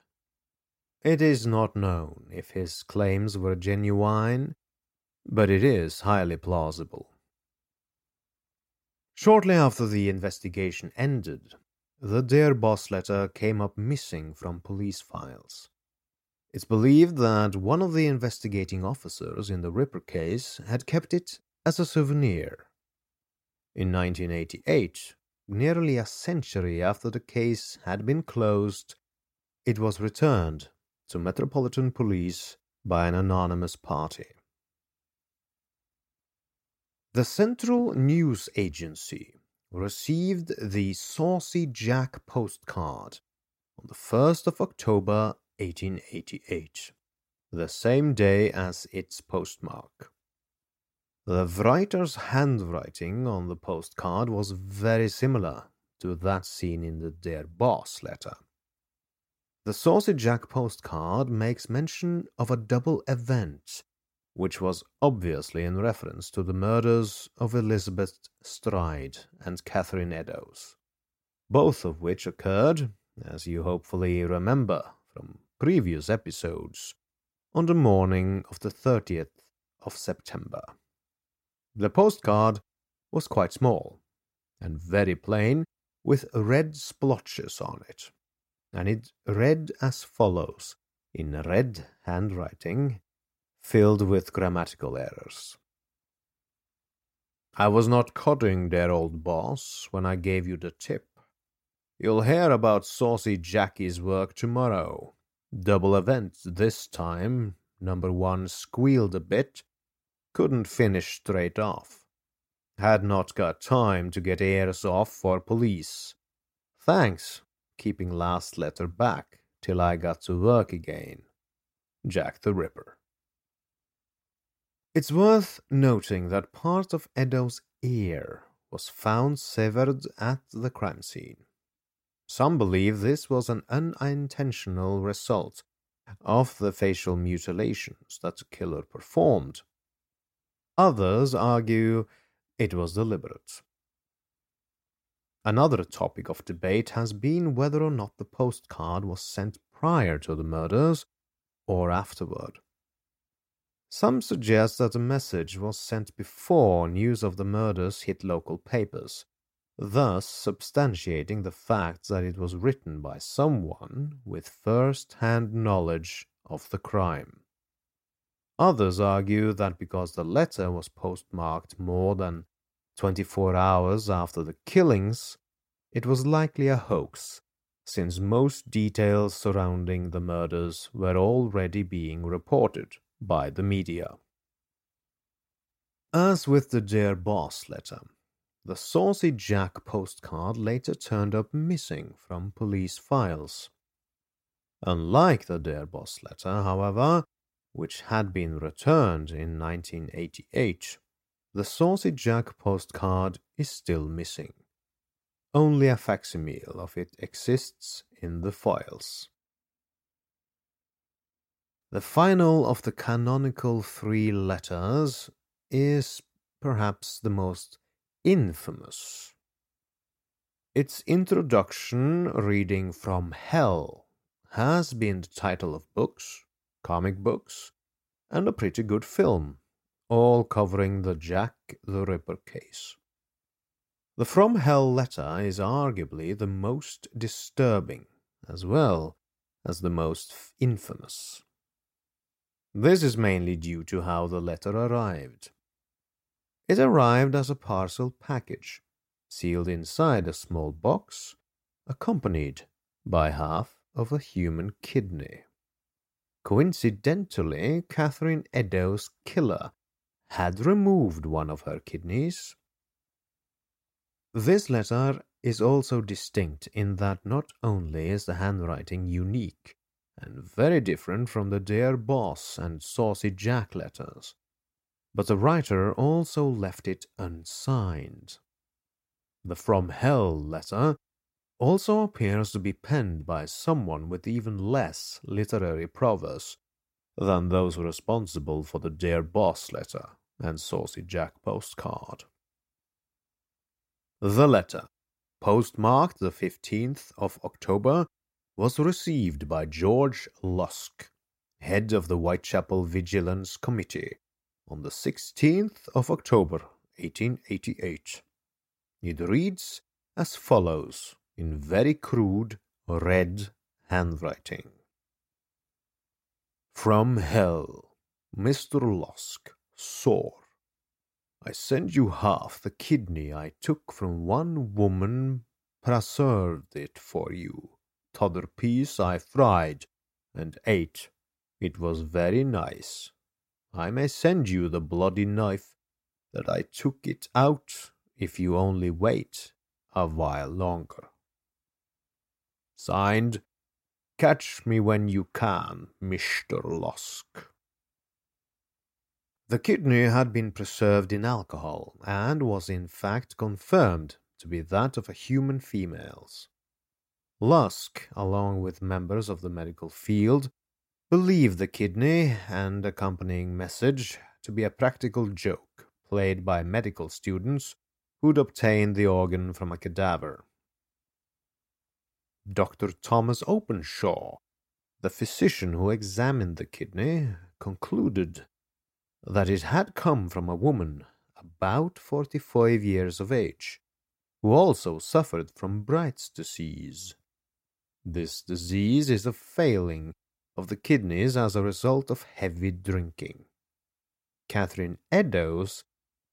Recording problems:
none

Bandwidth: 16 kHz